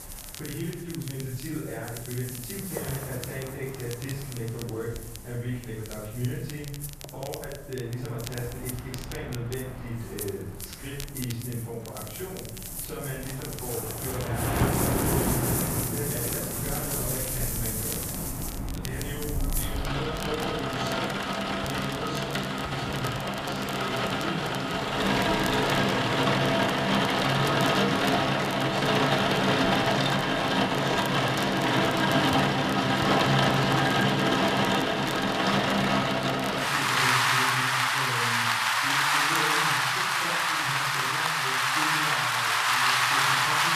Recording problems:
off-mic speech; far
room echo; noticeable; dies away in 0.9 s
rain or running water; very loud; throughout; 10 dB above the speech
crackle, like an old record; loud; 8 dB below the speech
murmuring crowd; faint; throughout; 30 dB below the speech

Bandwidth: 14.5 kHz